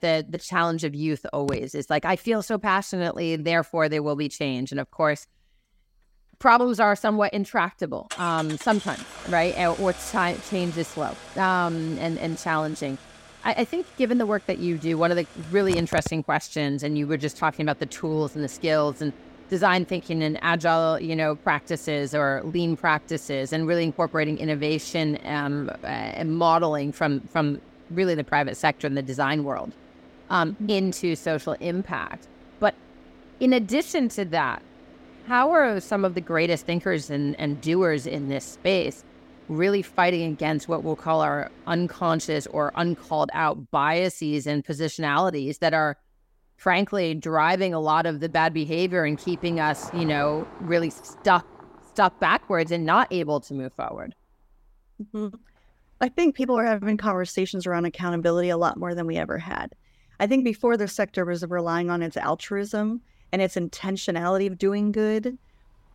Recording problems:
traffic noise; noticeable; throughout; 20 dB below the speech

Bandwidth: 16 kHz